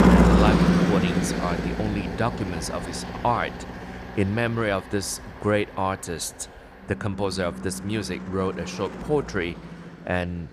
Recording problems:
traffic noise; very loud; throughout; 2 dB above the speech

